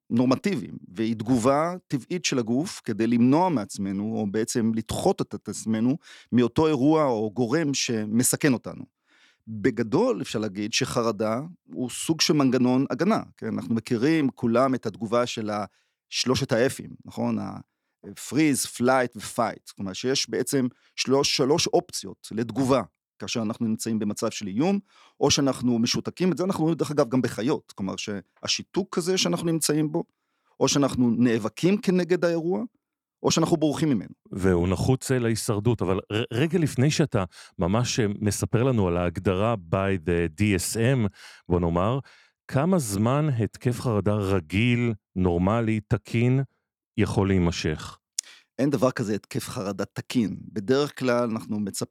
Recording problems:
none

